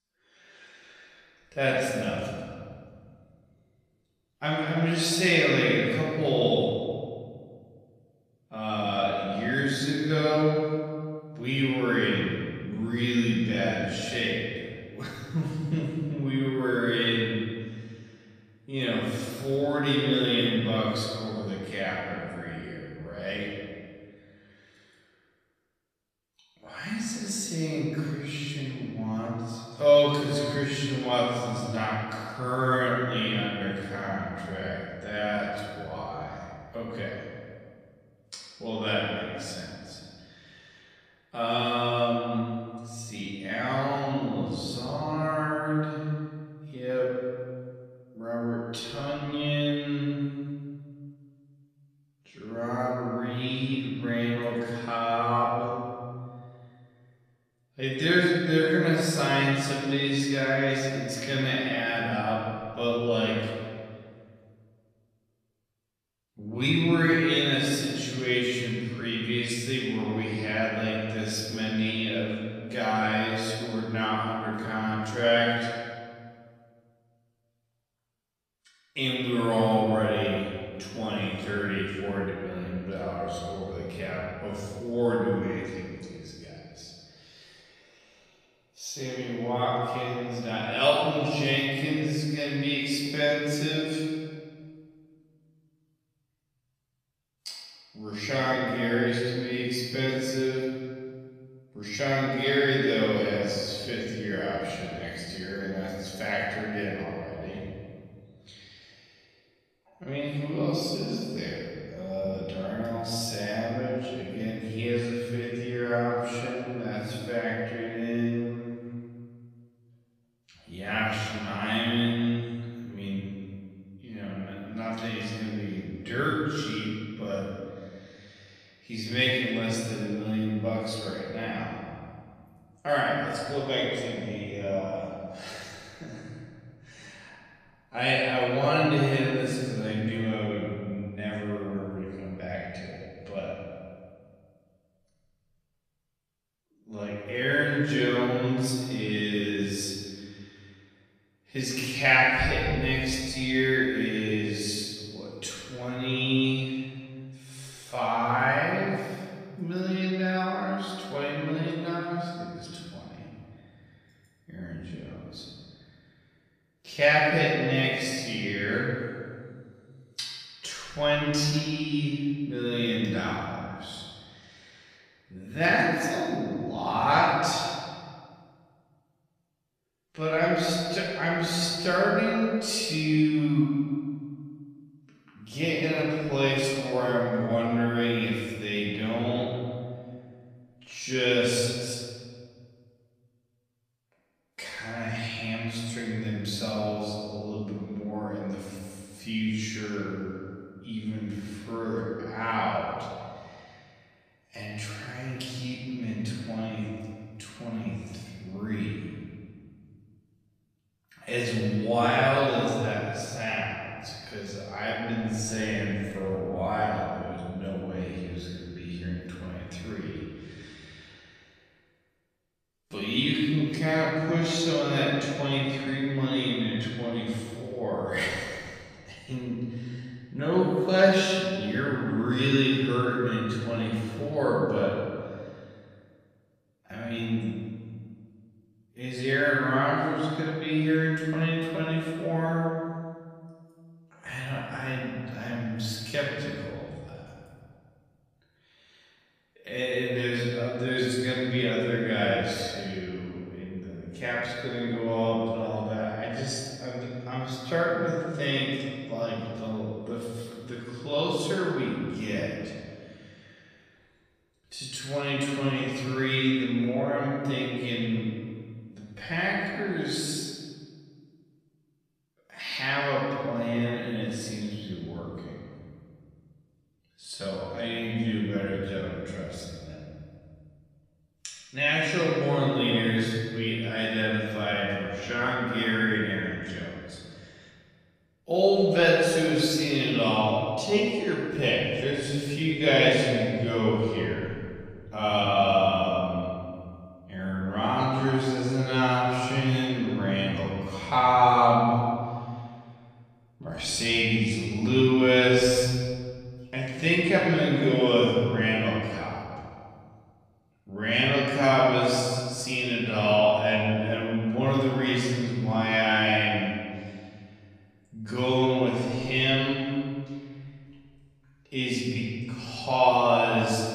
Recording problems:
off-mic speech; far
wrong speed, natural pitch; too slow; 0.5 times normal speed
room echo; noticeable; dies away in 1.9 s

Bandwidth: 14.5 kHz